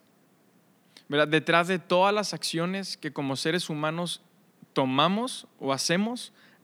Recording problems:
none

